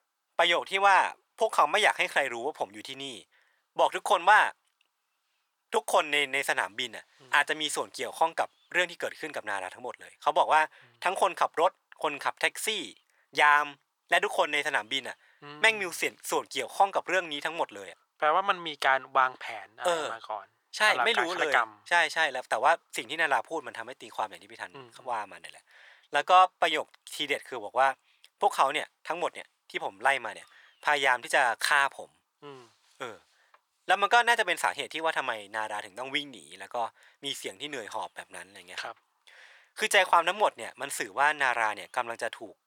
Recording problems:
thin; very; fading below 900 Hz

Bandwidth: 18.5 kHz